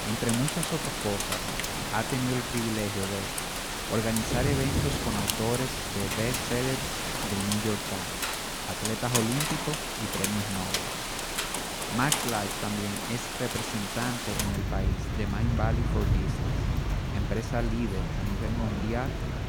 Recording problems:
rain or running water; very loud; throughout; 2 dB above the speech

